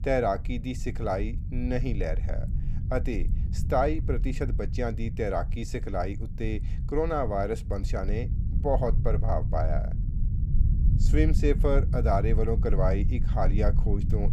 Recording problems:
low rumble; noticeable; throughout; 15 dB below the speech

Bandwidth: 15 kHz